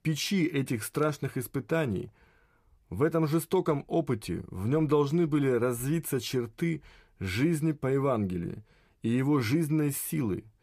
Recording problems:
none

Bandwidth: 14.5 kHz